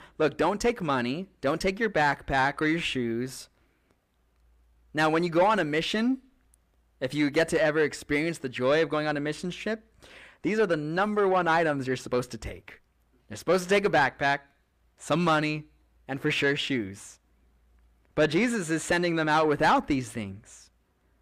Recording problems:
distortion; slight; 10 dB below the speech

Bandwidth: 15 kHz